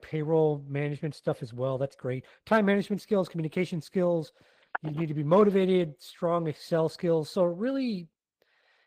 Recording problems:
garbled, watery; slightly; nothing above 15 kHz
phone ringing; noticeable; at 4.5 s; peak 10 dB below the speech

